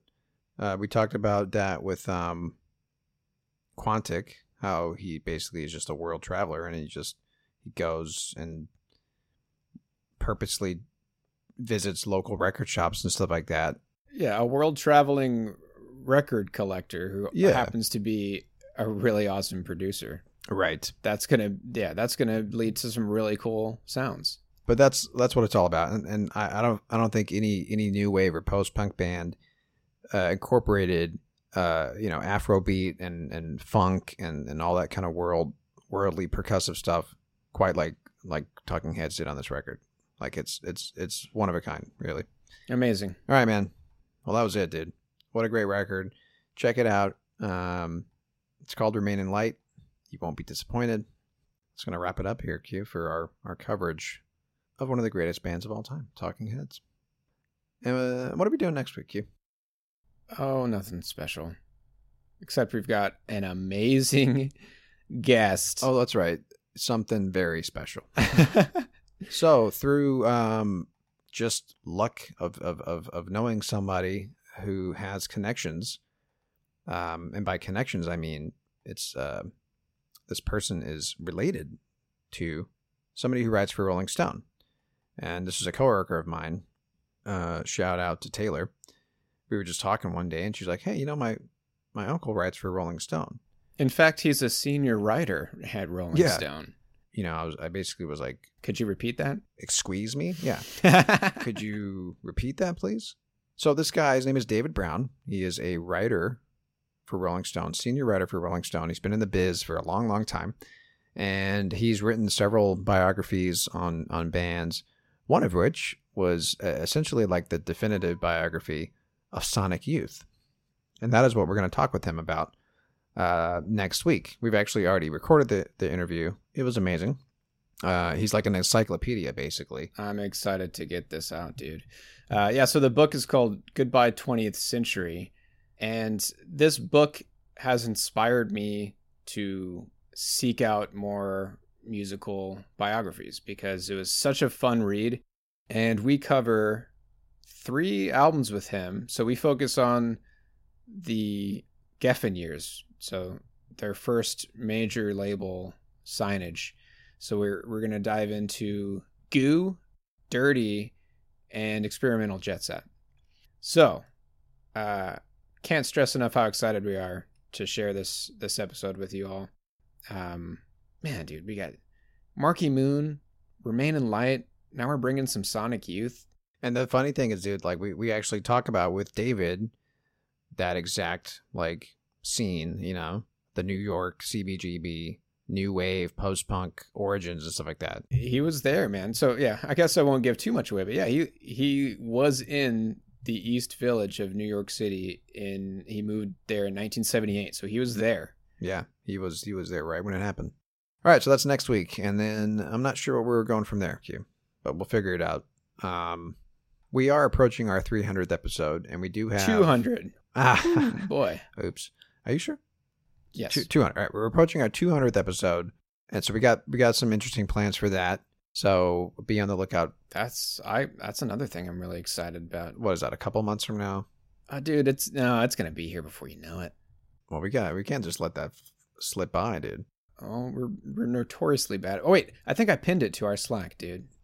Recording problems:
none

